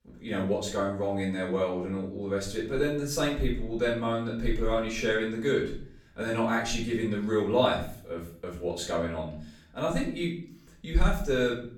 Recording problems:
off-mic speech; far
room echo; slight; dies away in 0.5 s

